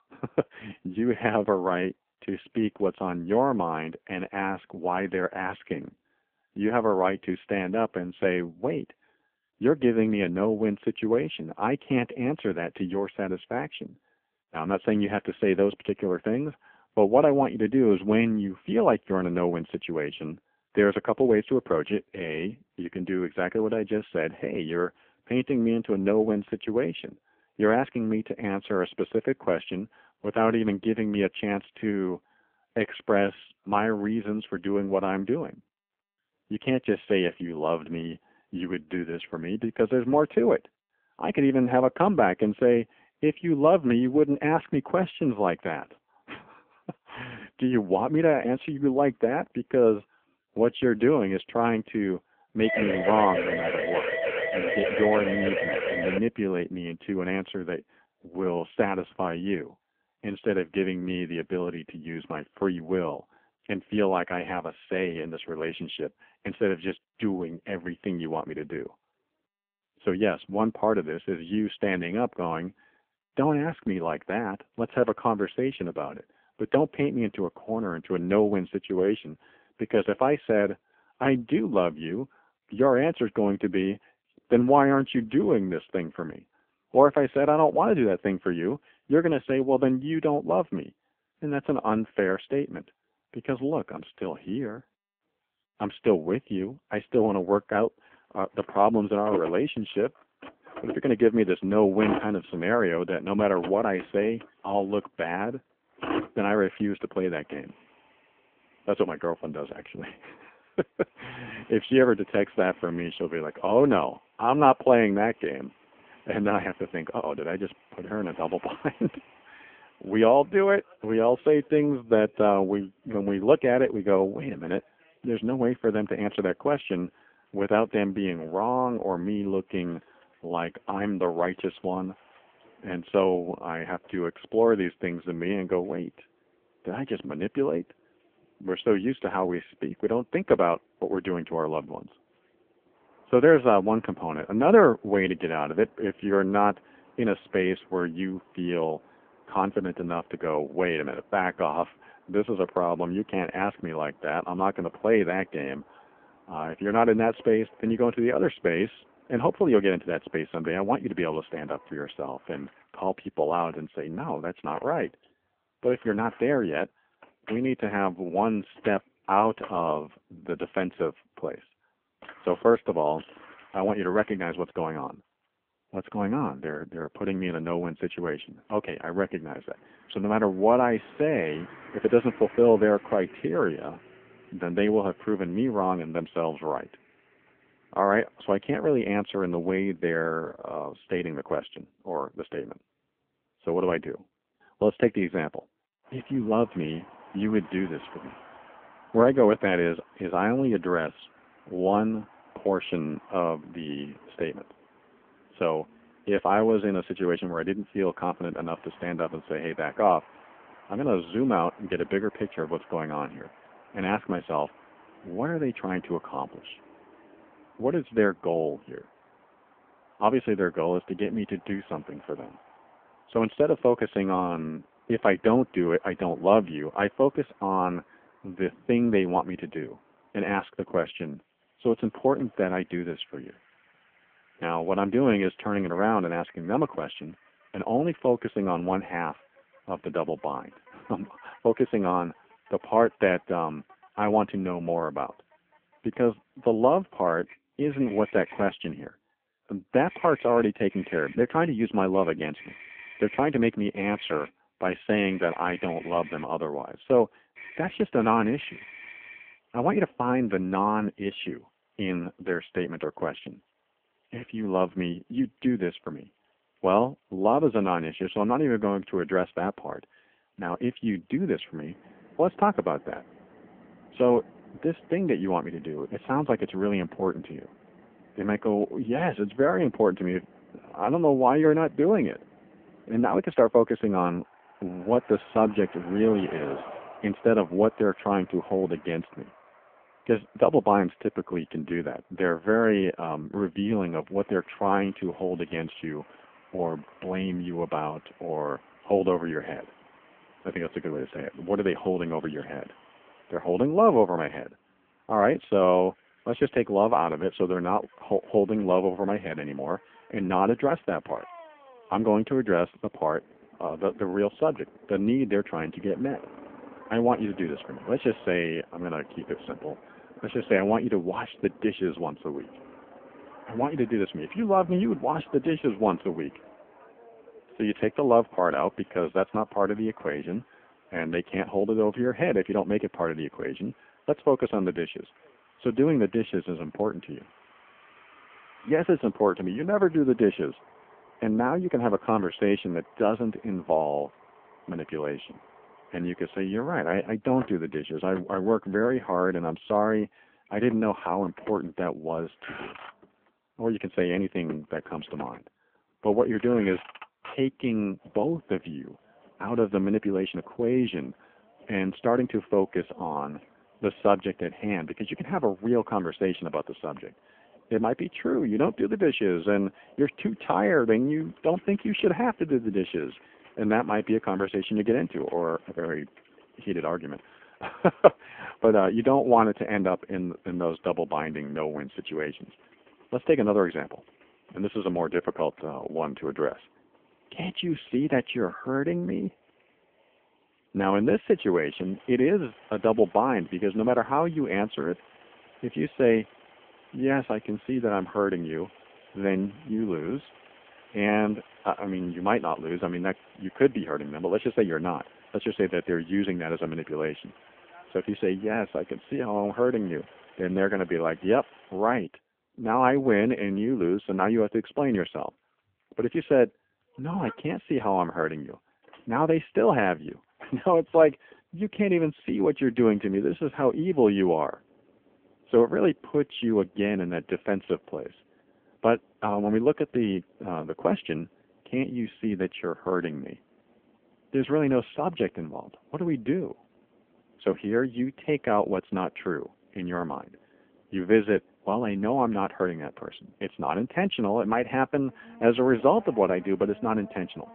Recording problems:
phone-call audio; poor line; nothing above 3.5 kHz
traffic noise; faint; from 1:37 on; 25 dB below the speech
siren; noticeable; from 53 to 56 s; peak level with the speech

